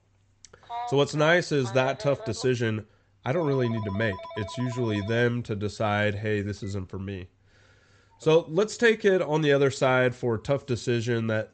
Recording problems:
high frequencies cut off; noticeable; nothing above 8 kHz
phone ringing; noticeable; from 0.5 to 8.5 s; peak 10 dB below the speech

